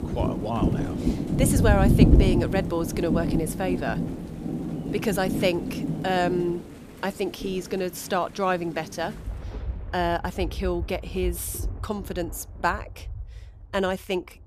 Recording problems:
rain or running water; very loud; throughout; 1 dB above the speech

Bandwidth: 14.5 kHz